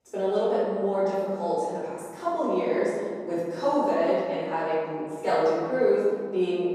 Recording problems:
room echo; strong; dies away in 1.8 s
off-mic speech; far

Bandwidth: 15 kHz